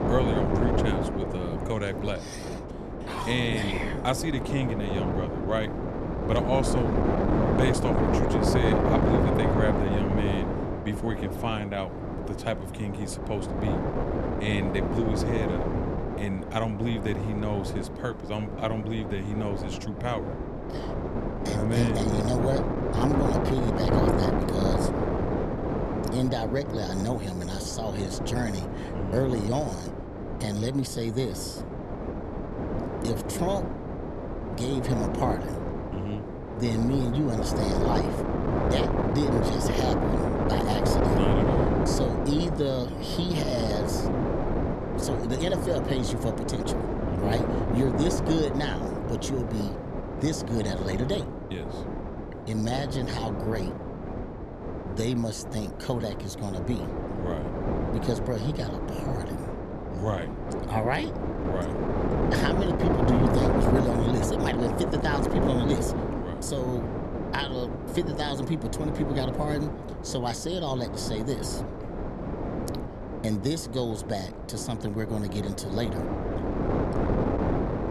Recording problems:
wind noise on the microphone; heavy; 1 dB above the speech

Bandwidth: 13.5 kHz